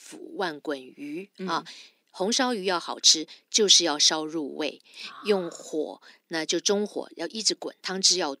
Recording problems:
thin; somewhat; fading below 250 Hz

